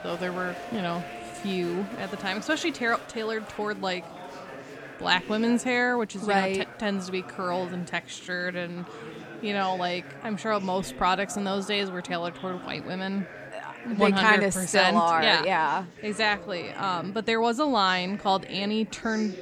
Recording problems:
chatter from many people; noticeable; throughout; 15 dB below the speech

